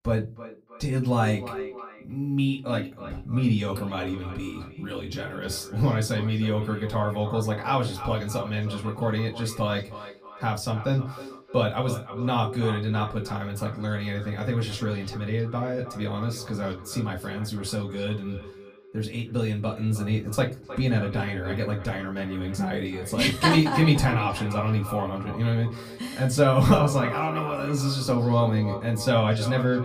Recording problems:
off-mic speech; far
echo of what is said; noticeable; throughout; 310 ms later, 15 dB below the speech
room echo; very slight; dies away in 0.2 s

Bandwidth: 15 kHz